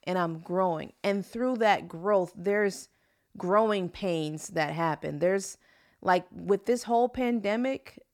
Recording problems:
none

